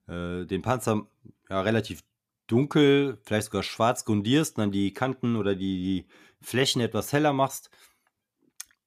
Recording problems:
none

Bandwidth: 14.5 kHz